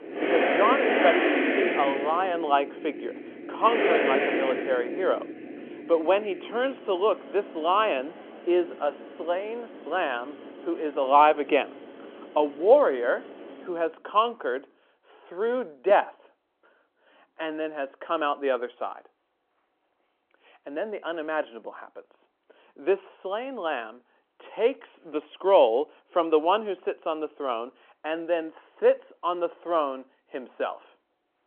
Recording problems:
phone-call audio
traffic noise; loud; until 14 s; 1 dB below the speech

